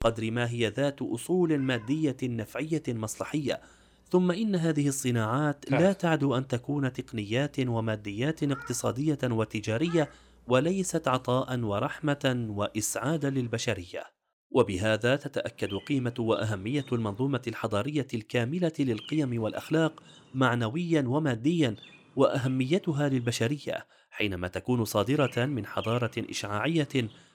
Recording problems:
animal sounds; noticeable; throughout; 15 dB below the speech

